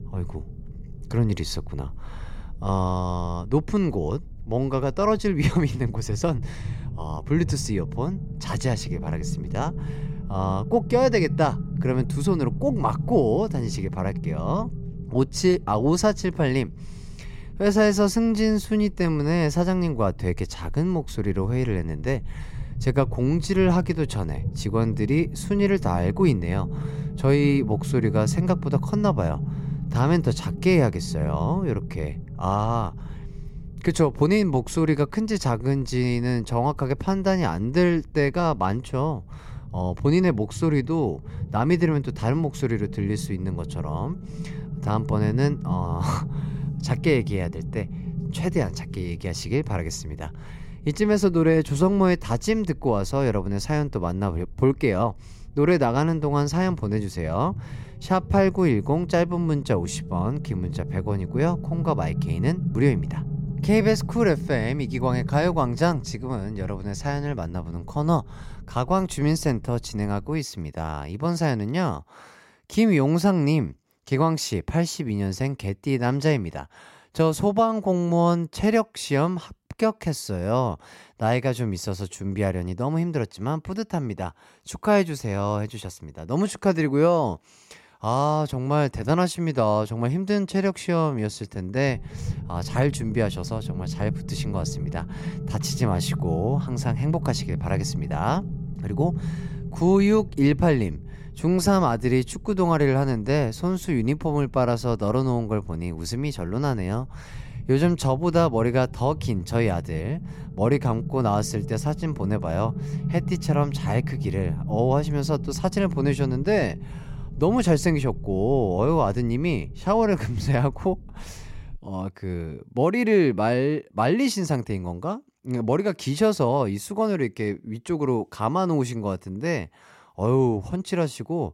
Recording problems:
low rumble; noticeable; until 1:10 and from 1:32 to 2:02; 15 dB below the speech

